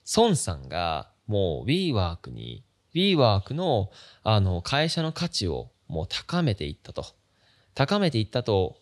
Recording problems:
none

